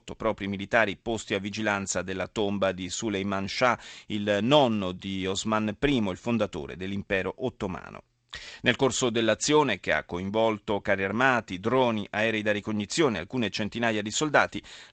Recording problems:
garbled, watery; slightly; nothing above 7.5 kHz

